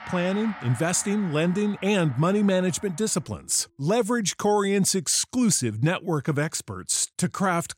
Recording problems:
background music; noticeable; until 3 s; 20 dB below the speech

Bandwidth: 16 kHz